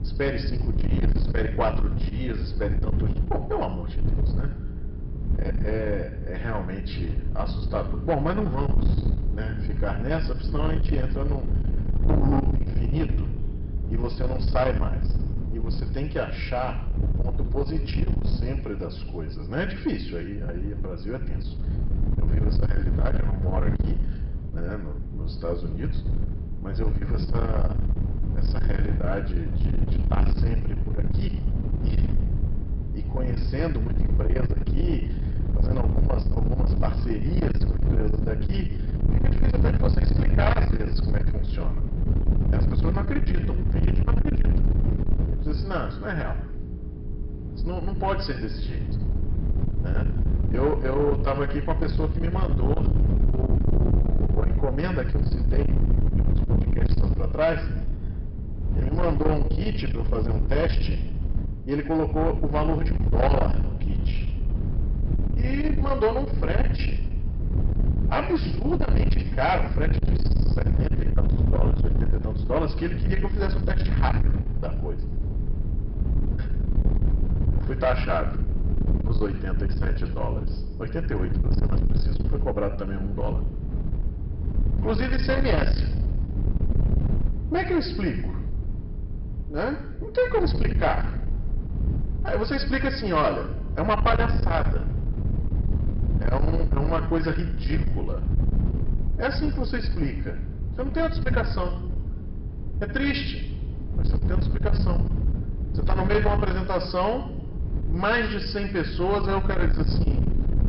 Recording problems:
distortion; heavy; 8 dB below the speech
high frequencies cut off; noticeable; nothing above 5.5 kHz
room echo; slight; dies away in 0.8 s
off-mic speech; somewhat distant
wind noise on the microphone; heavy; 9 dB below the speech
electrical hum; faint; throughout; 60 Hz, 25 dB below the speech

